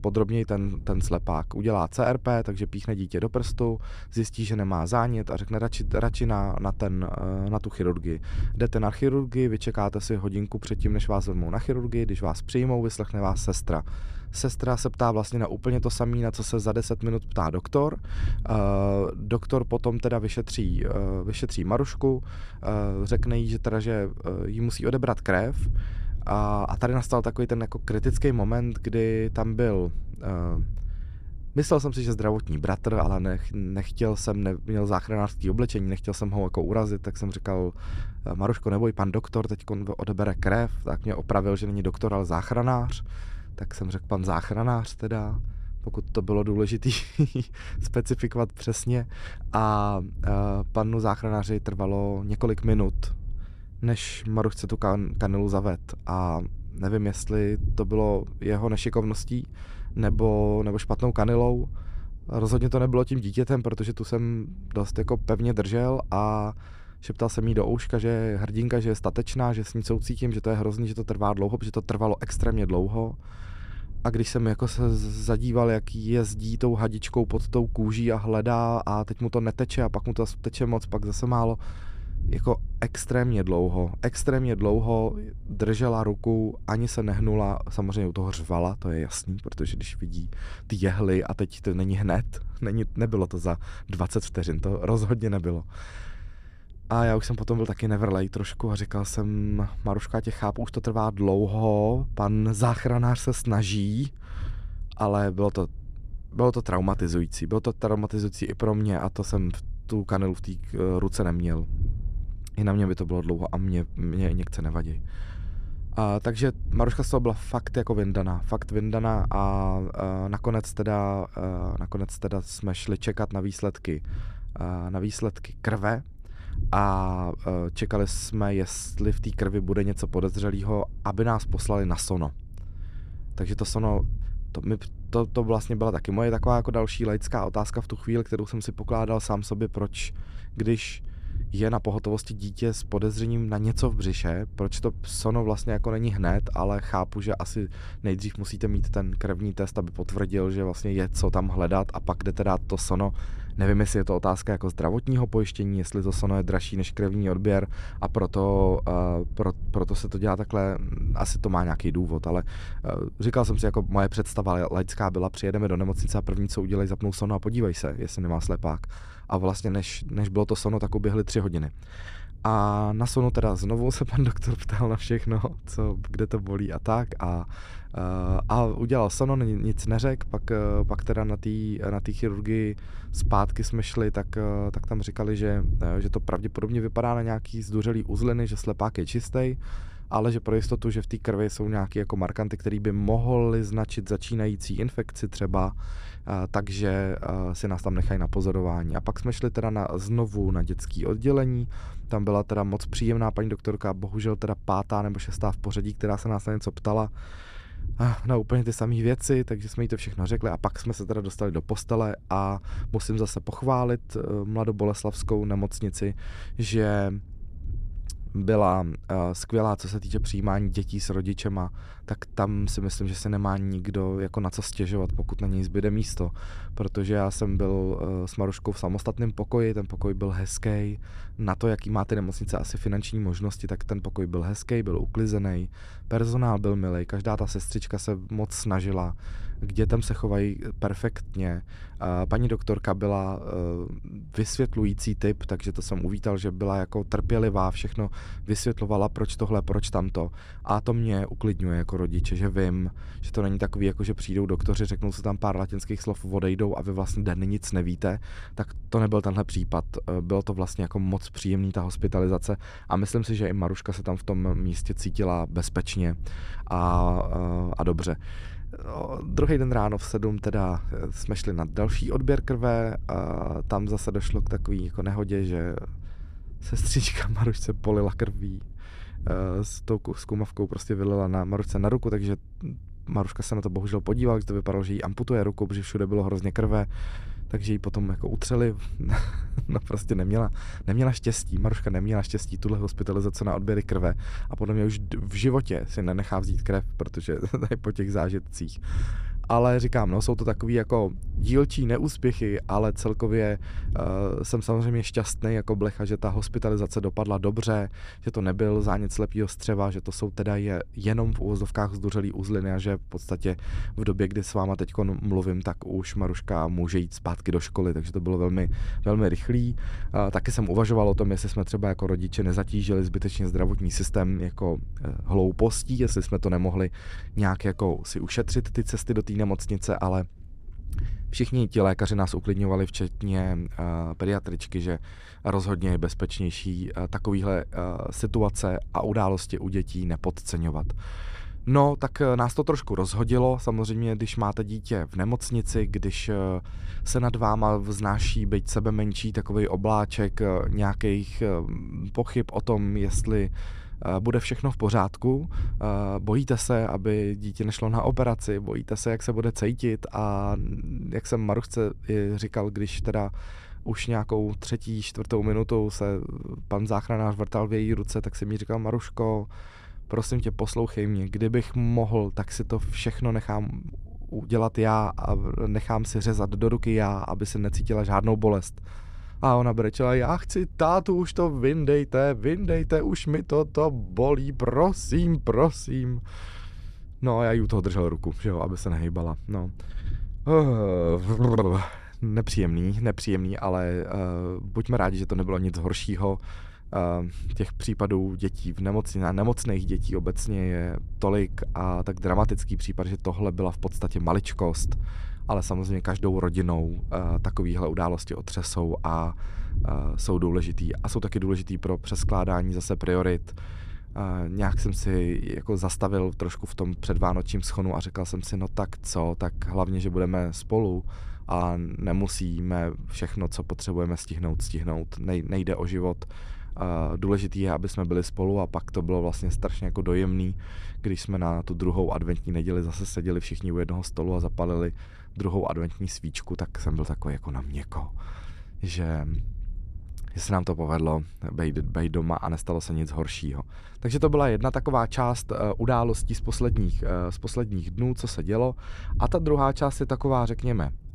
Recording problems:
low rumble; faint; throughout; 25 dB below the speech

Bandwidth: 14.5 kHz